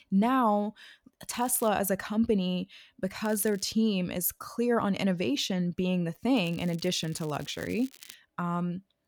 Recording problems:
crackling; faint; at 1.5 s, at 3.5 s and from 6.5 to 8 s; 20 dB below the speech

